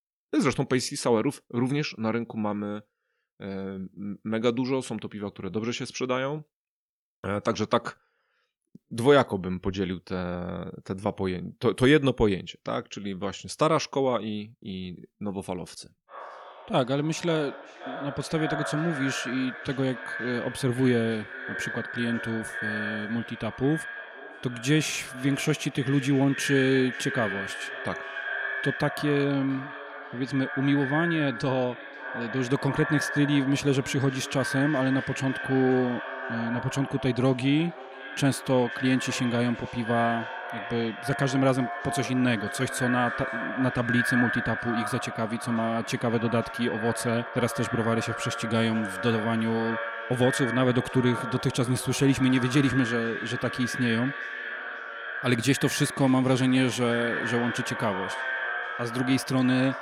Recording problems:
echo of what is said; strong; from 16 s on; 530 ms later, 6 dB below the speech

